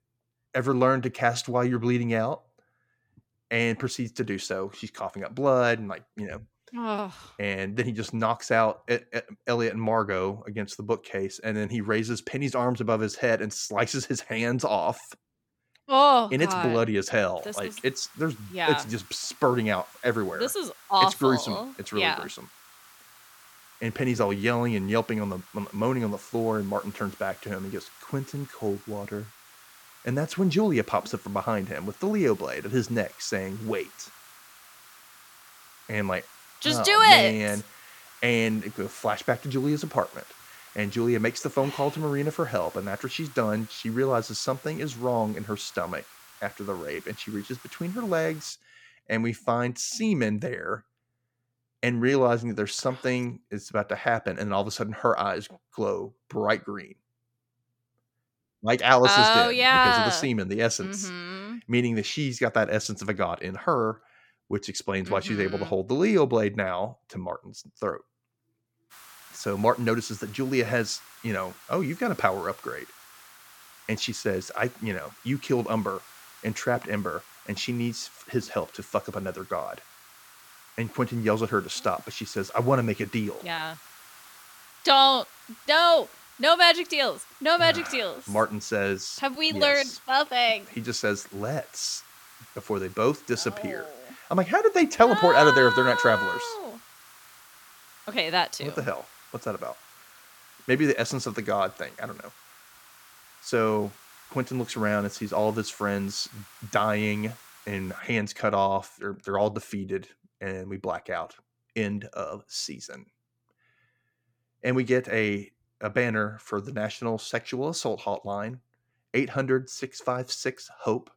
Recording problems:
hiss; faint; from 17 to 49 s and from 1:09 to 1:48; 25 dB below the speech

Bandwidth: 17.5 kHz